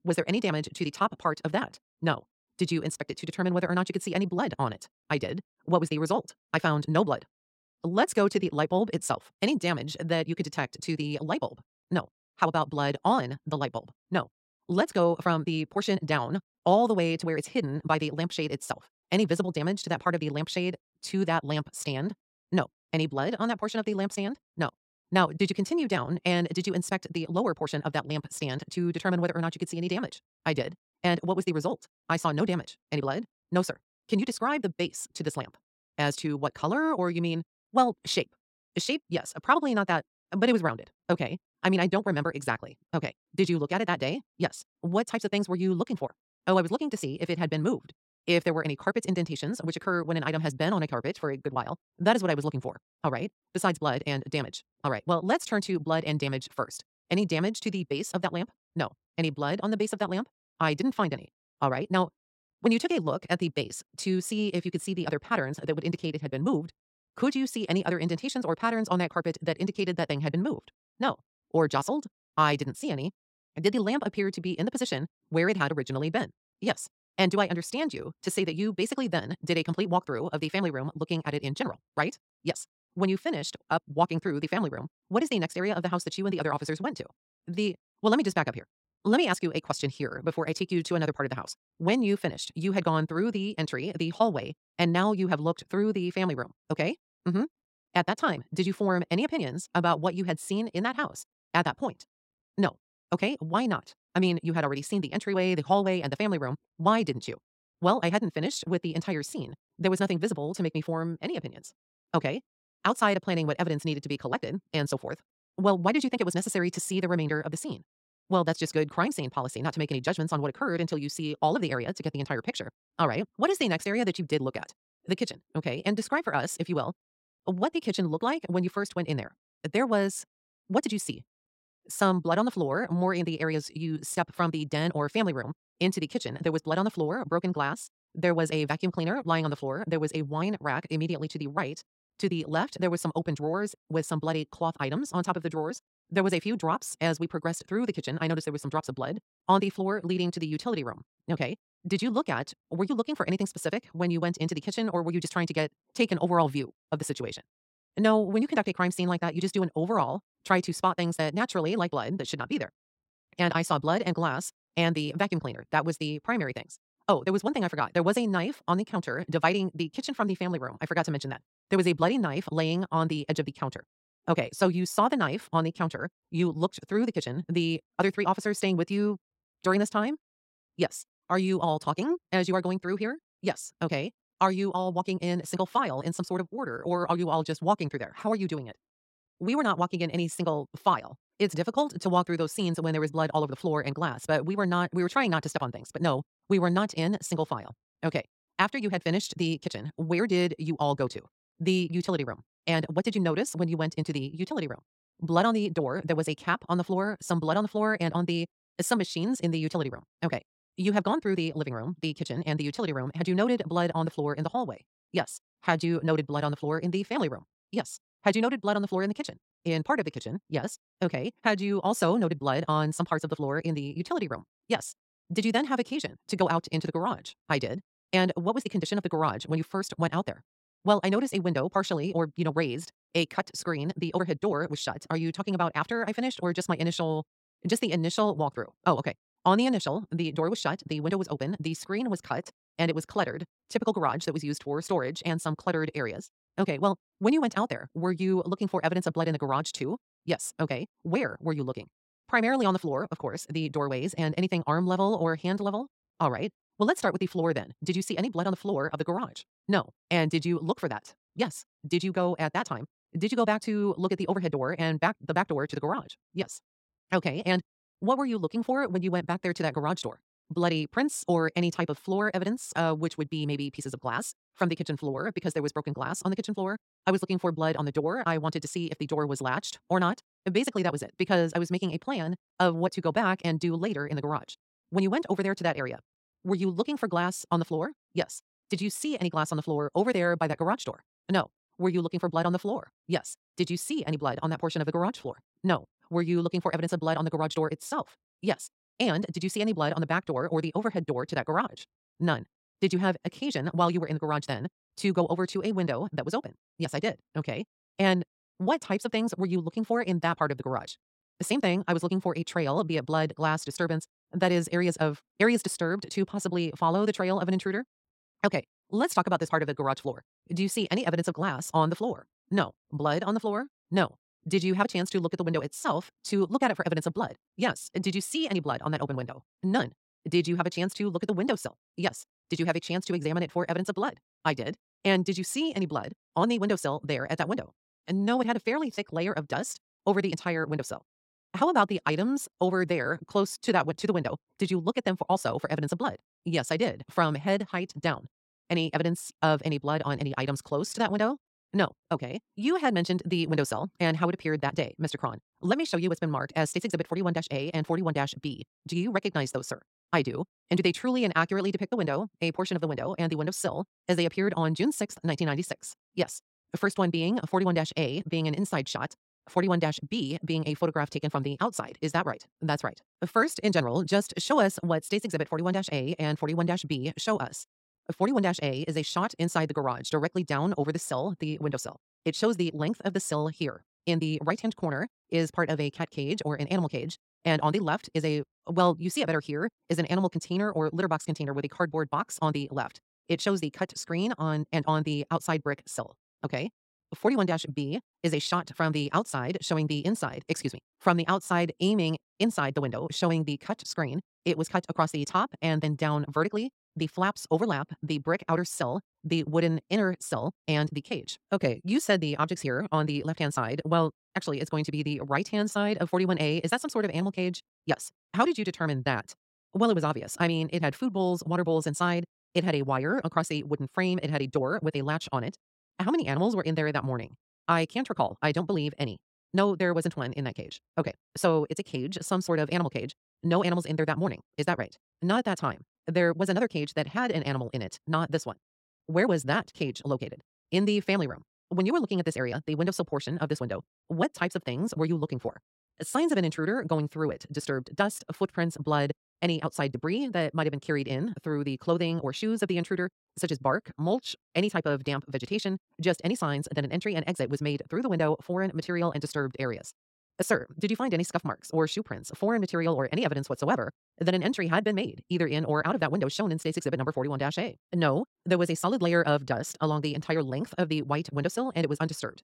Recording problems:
wrong speed, natural pitch; too fast; 1.6 times normal speed

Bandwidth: 16 kHz